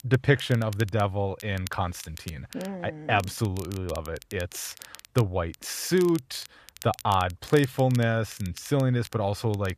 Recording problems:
crackle, like an old record; noticeable; 20 dB below the speech

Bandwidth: 14.5 kHz